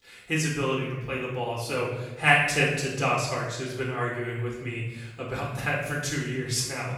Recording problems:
off-mic speech; far
room echo; noticeable; dies away in 1 s

